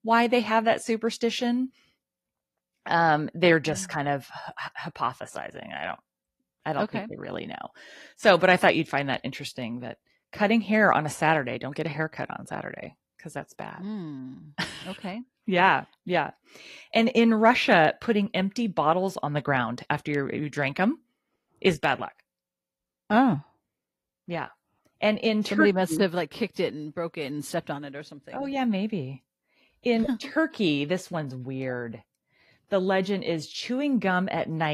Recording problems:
garbled, watery; slightly
abrupt cut into speech; at the end

